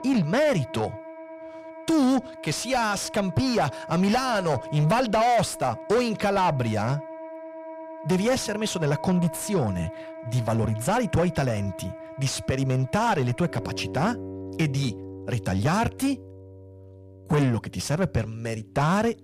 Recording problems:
distortion; heavy; 7 dB below the speech
background music; noticeable; throughout; 15 dB below the speech

